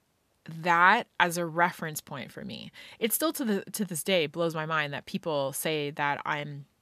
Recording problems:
none

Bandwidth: 14.5 kHz